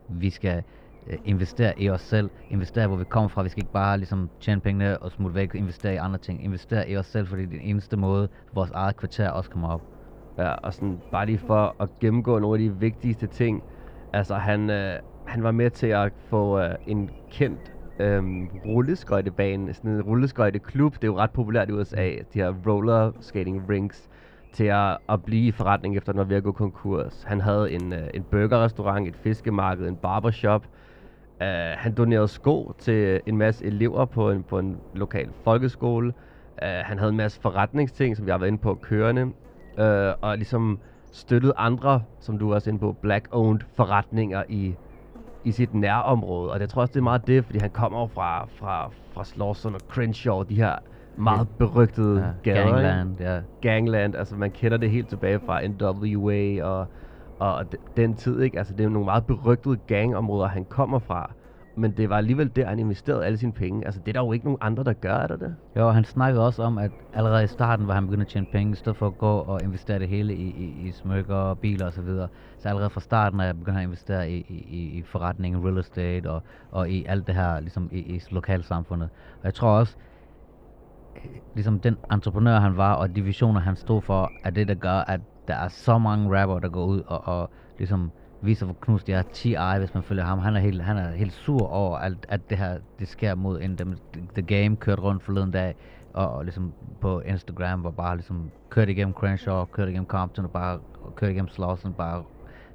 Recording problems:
muffled; slightly; fading above 2.5 kHz
electrical hum; faint; throughout; 50 Hz, 25 dB below the speech

